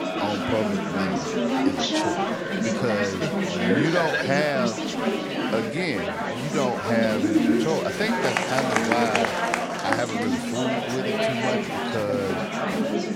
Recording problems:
chatter from many people; very loud; throughout; 3 dB above the speech

